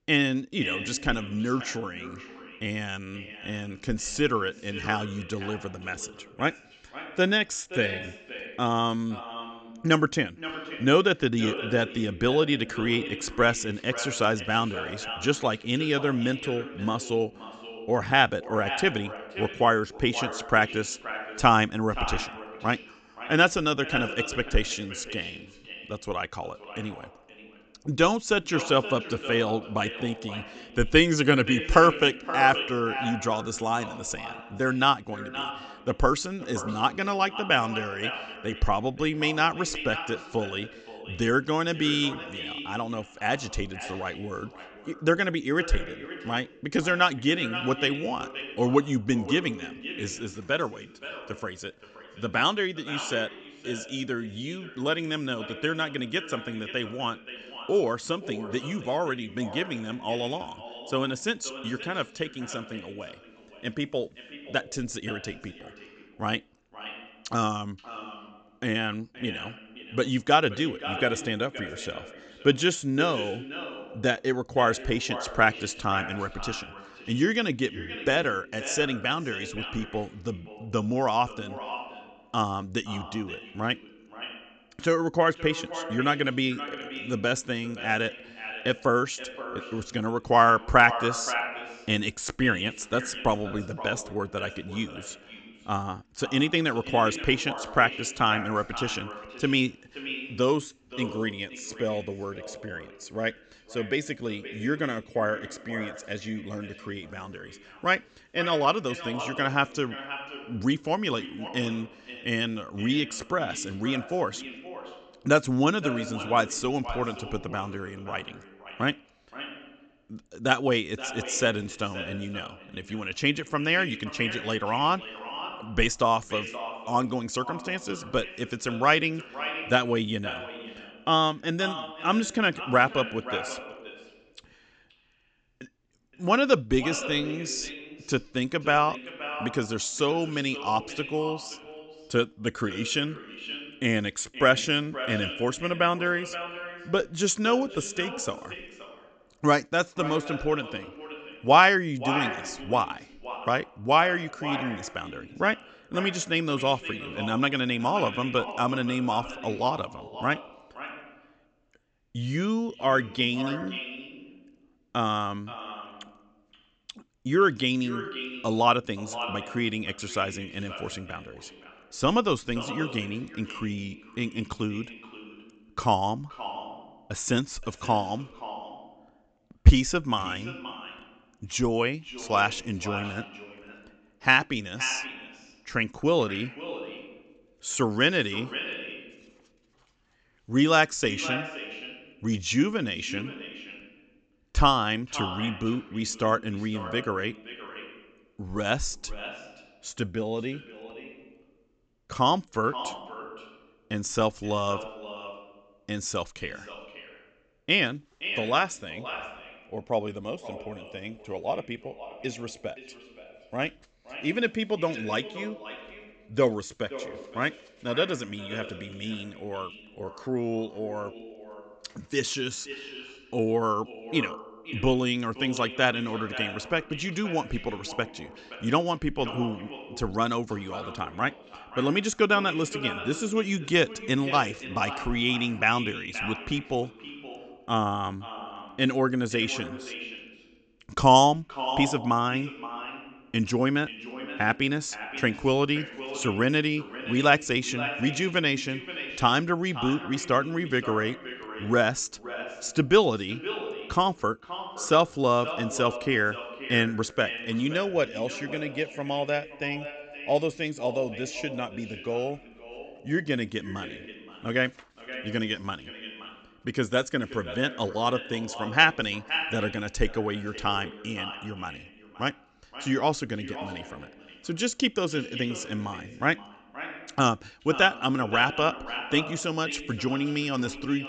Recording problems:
echo of what is said; strong; throughout; 520 ms later, 10 dB below the speech
high frequencies cut off; noticeable; nothing above 8 kHz

